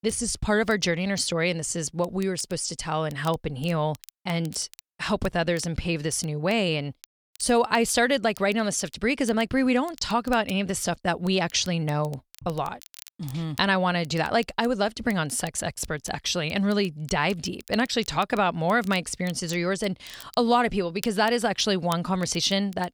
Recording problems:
crackle, like an old record; faint; 25 dB below the speech

